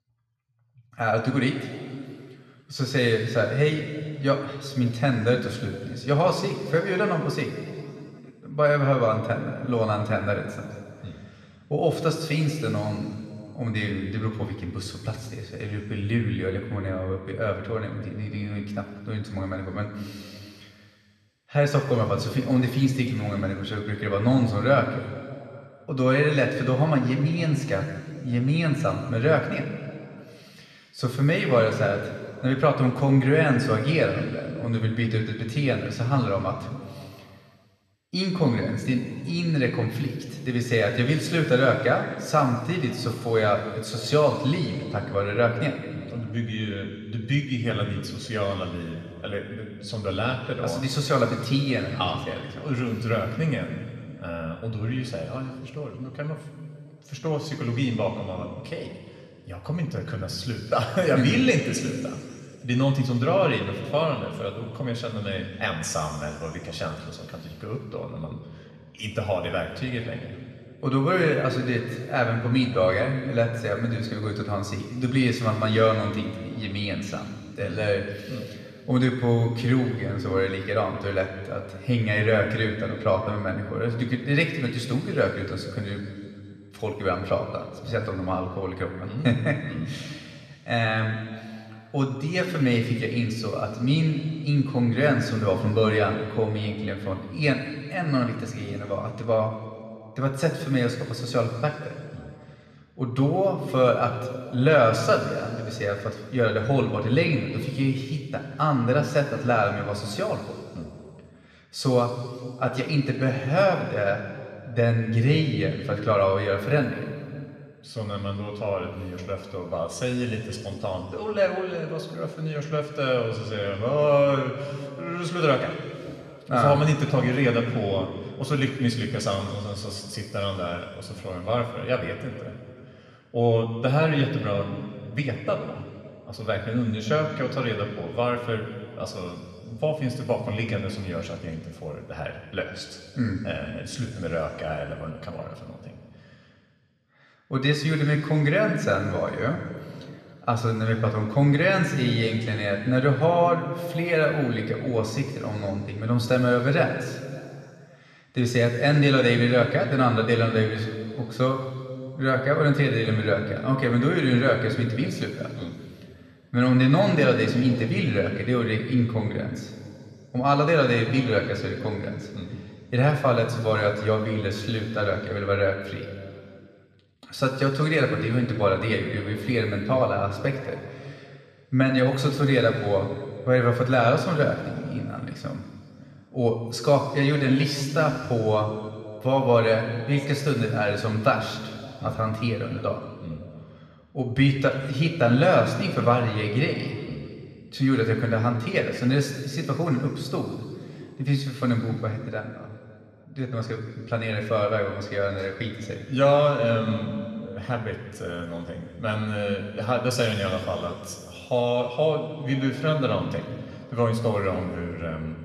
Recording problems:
room echo; noticeable; dies away in 2.3 s
off-mic speech; somewhat distant

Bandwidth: 13.5 kHz